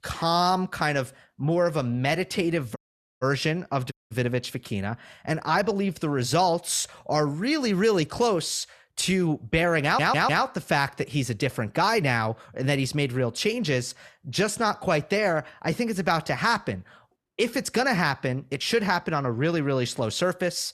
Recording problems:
audio cutting out; at 3 s and at 4 s
audio stuttering; at 10 s

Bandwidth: 13.5 kHz